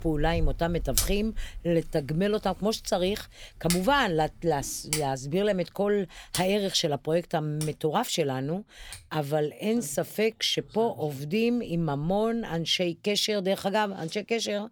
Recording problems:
household noises; loud; throughout; 7 dB below the speech

